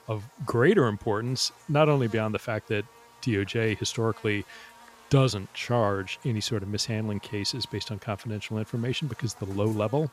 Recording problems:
electrical hum; faint; throughout; 50 Hz, 20 dB below the speech

